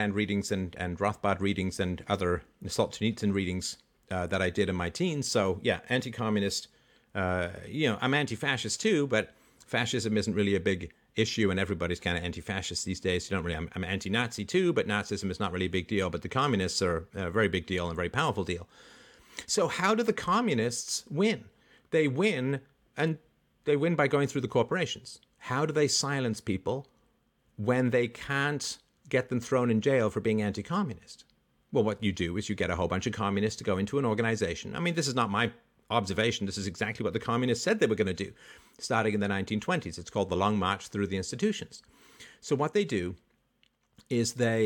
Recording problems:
abrupt cut into speech; at the start and the end

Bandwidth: 18 kHz